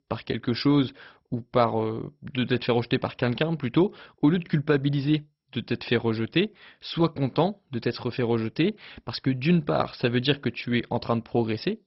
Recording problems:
garbled, watery; badly; nothing above 5.5 kHz

